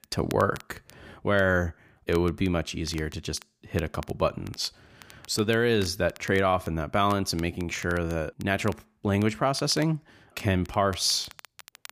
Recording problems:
crackle, like an old record; faint; 20 dB below the speech

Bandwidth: 15 kHz